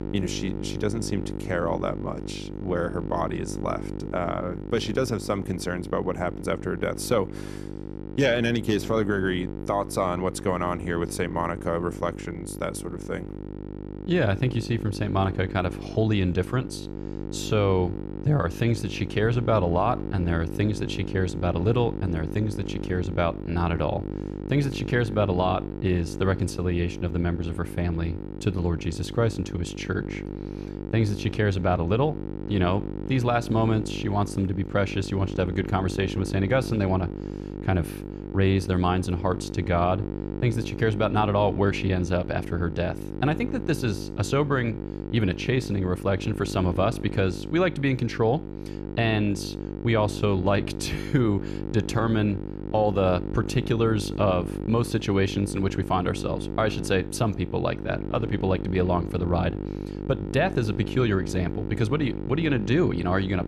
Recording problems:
electrical hum; noticeable; throughout; 50 Hz, 10 dB below the speech

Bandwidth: 14 kHz